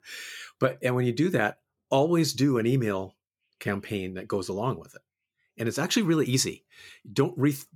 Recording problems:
none

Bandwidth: 17 kHz